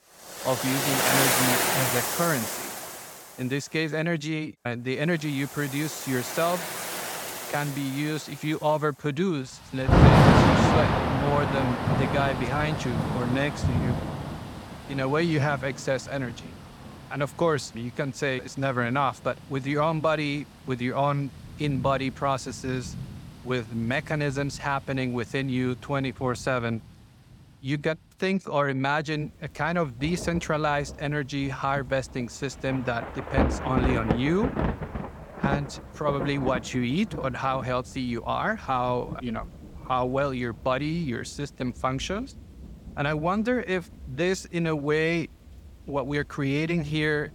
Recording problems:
rain or running water; very loud; throughout; 2 dB above the speech

